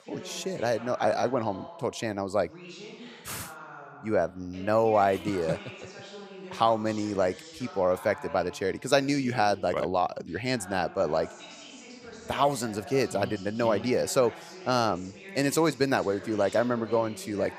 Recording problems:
voice in the background; noticeable; throughout; 15 dB below the speech

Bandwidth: 15 kHz